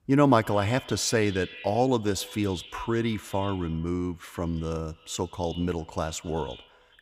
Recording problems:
echo of what is said; noticeable; throughout; 110 ms later, 15 dB below the speech

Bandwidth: 15.5 kHz